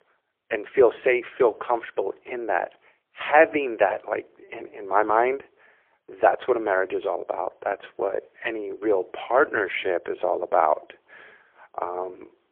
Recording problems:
phone-call audio; poor line

